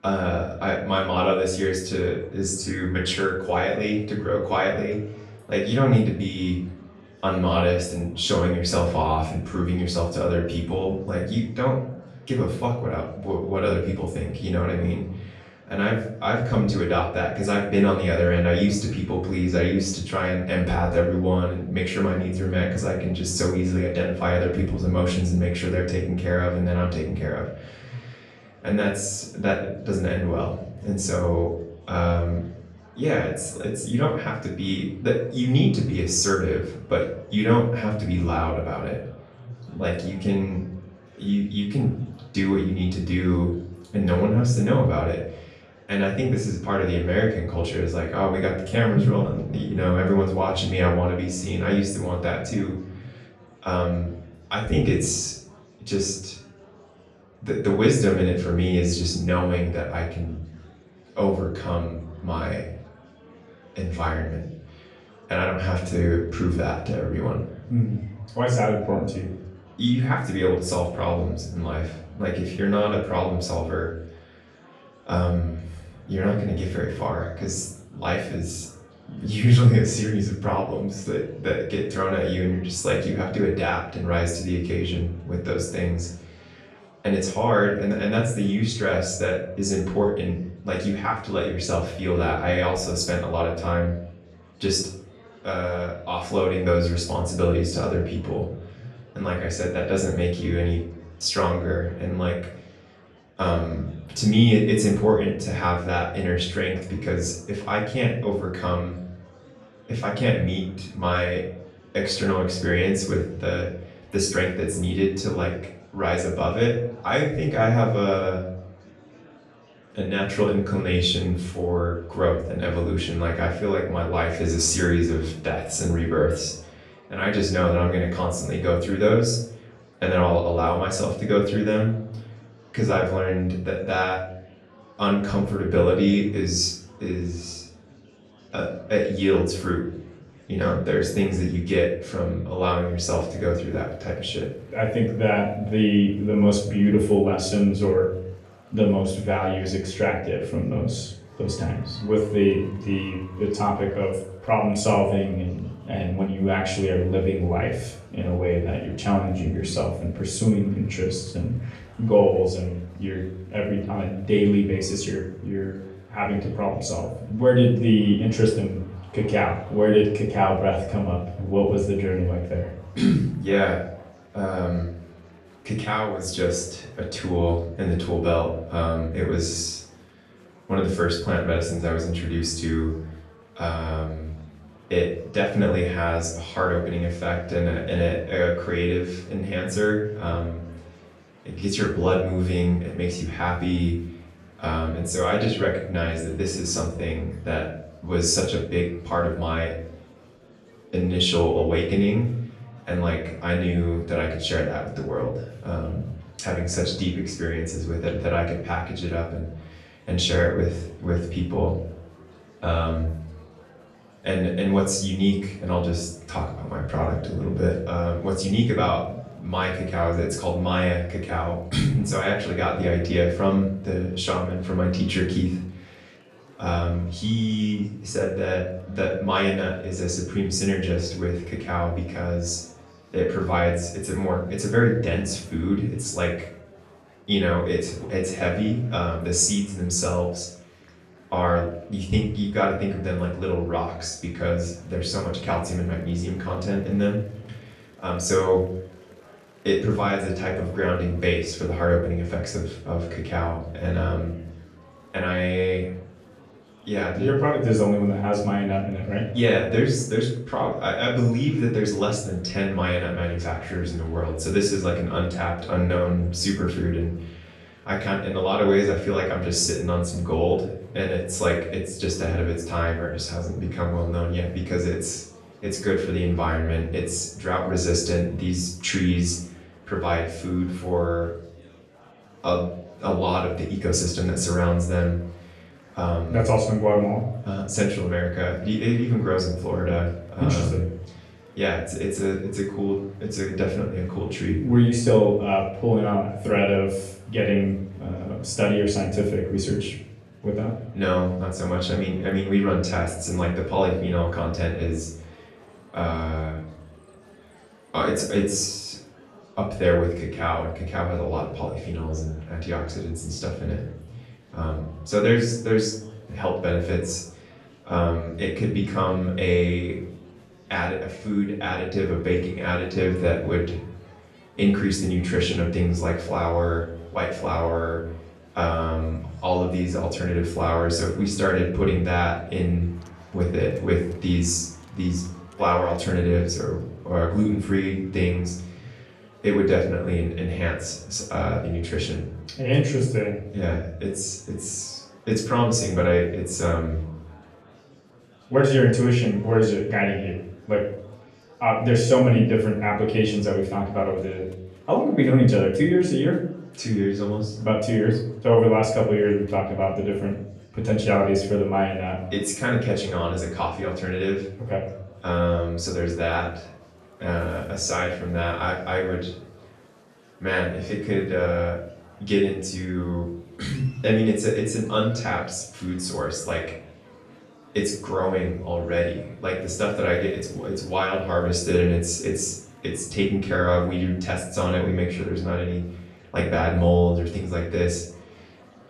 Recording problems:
off-mic speech; far
room echo; noticeable; dies away in 0.6 s
murmuring crowd; faint; throughout; 25 dB below the speech

